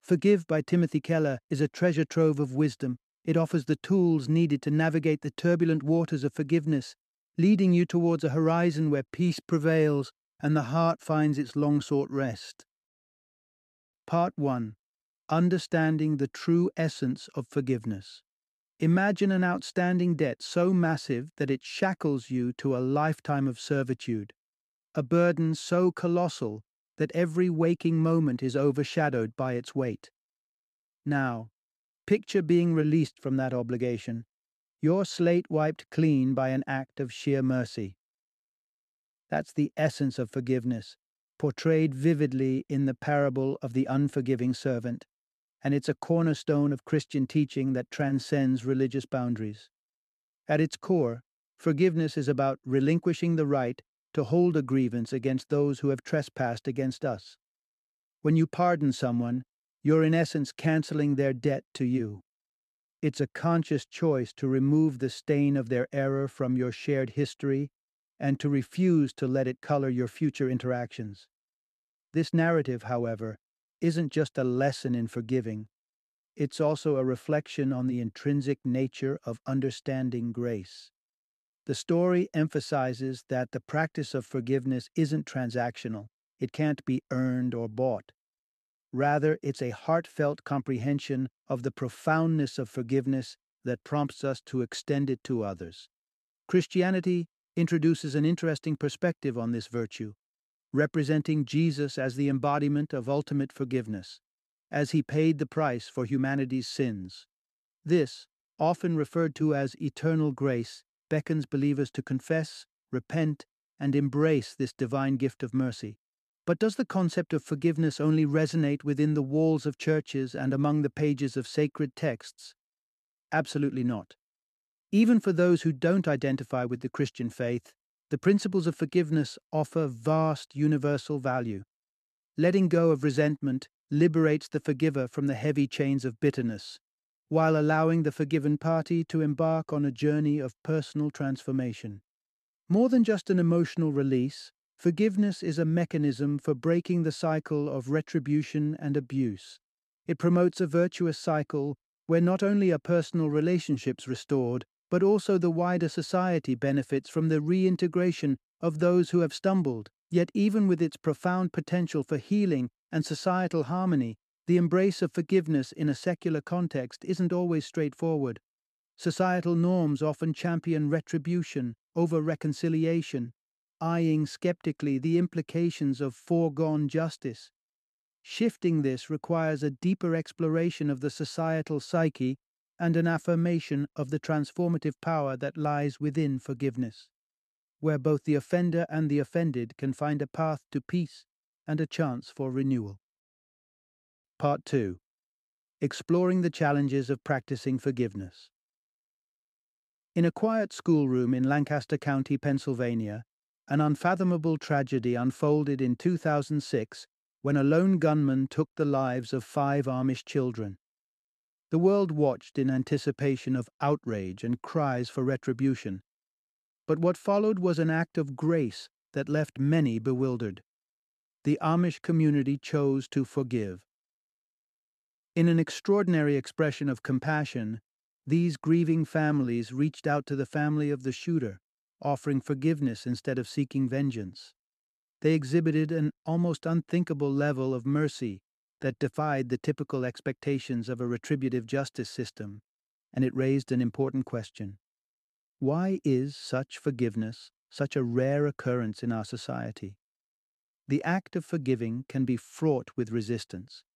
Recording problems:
uneven, jittery; slightly; from 1:12 to 3:59

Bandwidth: 13.5 kHz